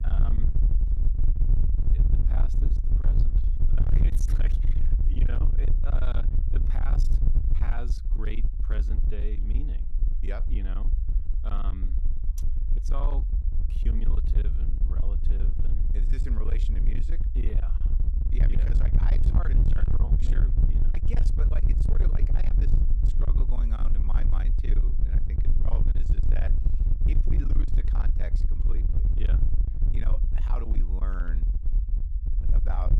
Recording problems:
distortion; heavy; 32% of the sound clipped
low rumble; loud; throughout; 2 dB below the speech

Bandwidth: 14.5 kHz